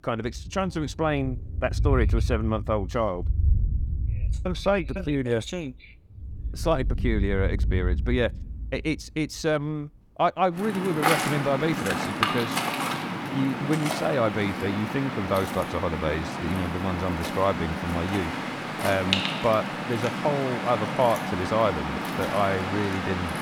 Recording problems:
rain or running water; loud; throughout; 2 dB below the speech

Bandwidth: 18 kHz